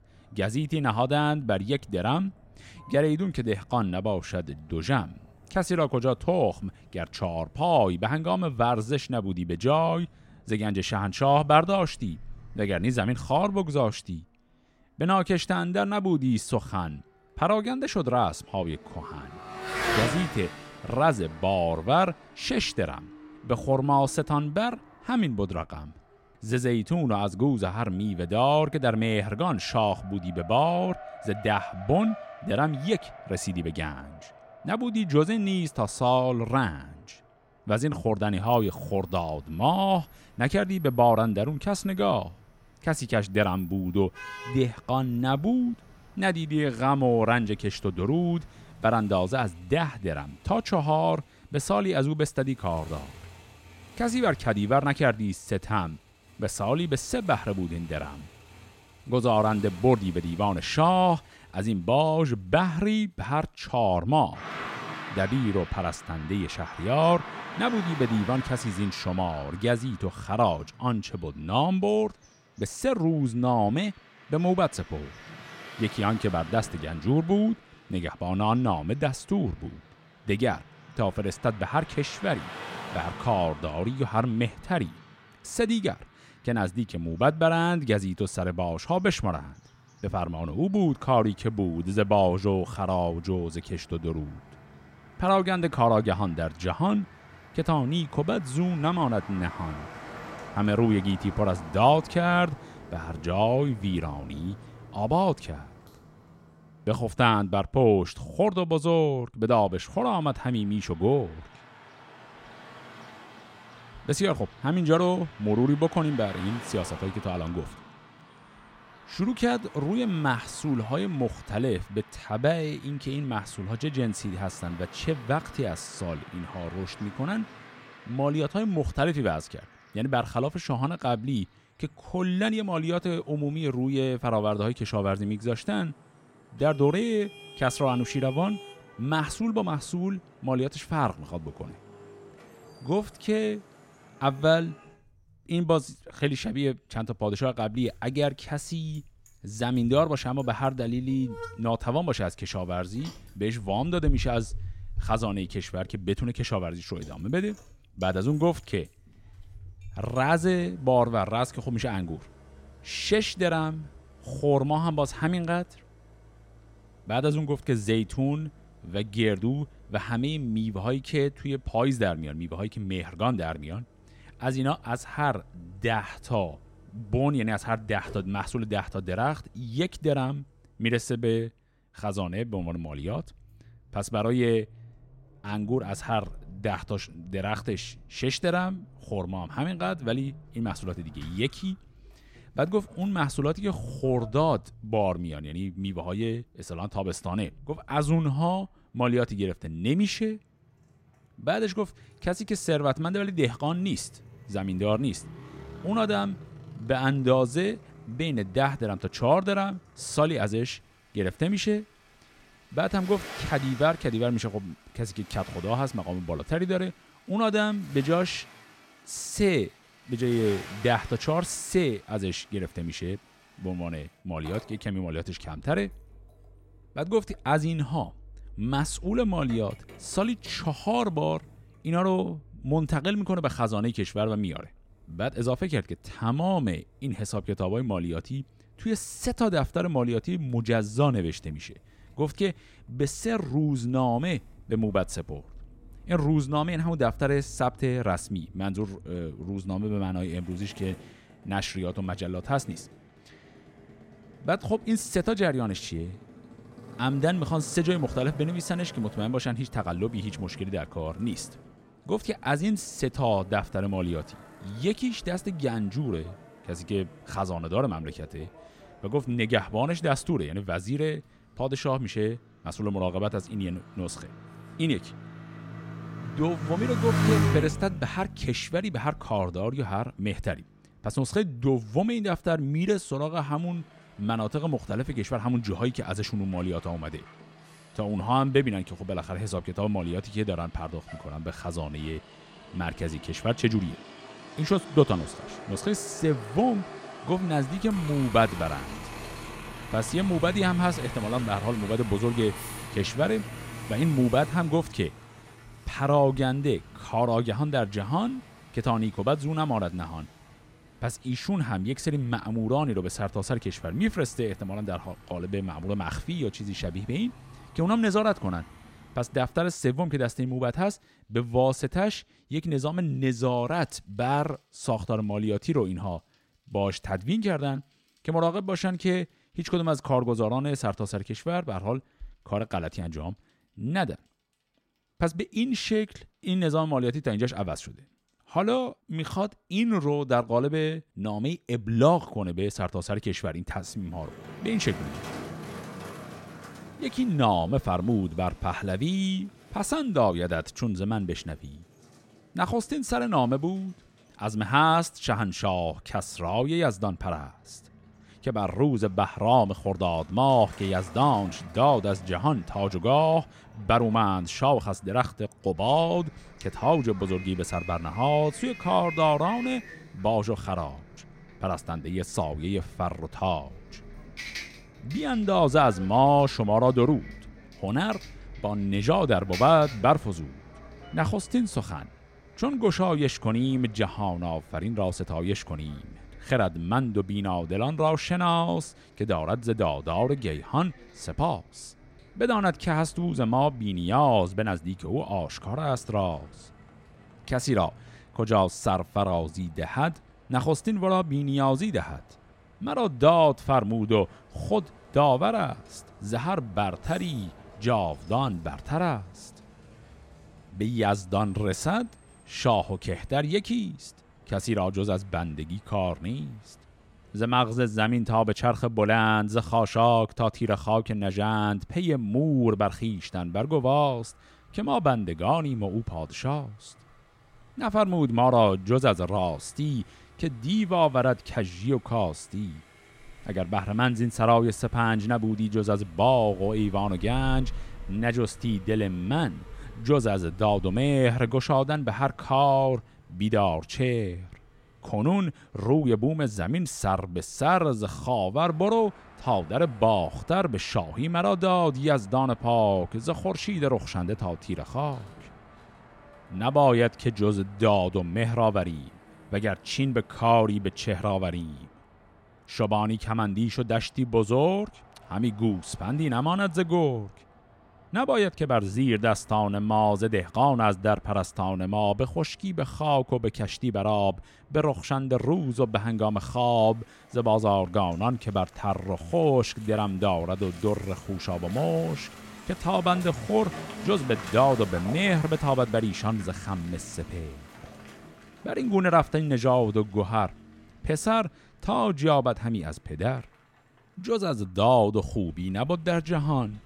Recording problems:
traffic noise; noticeable; throughout; 15 dB below the speech

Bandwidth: 16 kHz